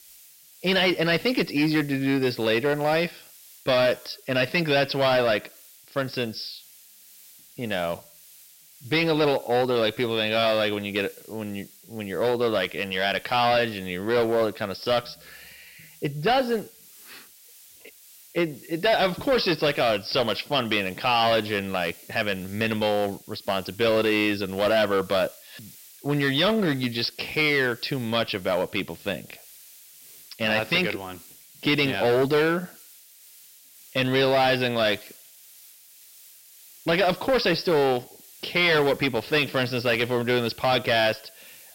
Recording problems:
distortion; heavy; 8% of the sound clipped
high frequencies cut off; noticeable; nothing above 5.5 kHz
hiss; faint; throughout; 25 dB below the speech

